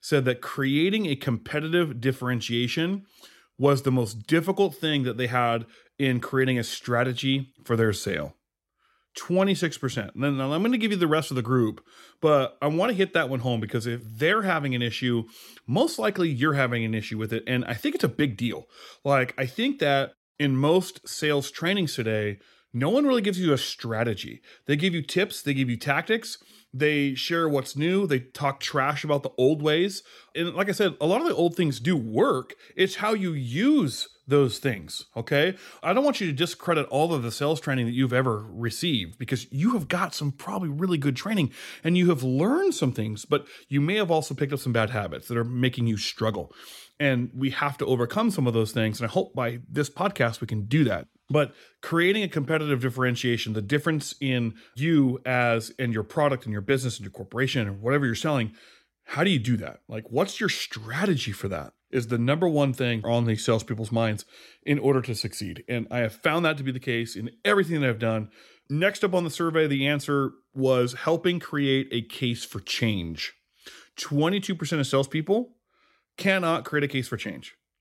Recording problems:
none

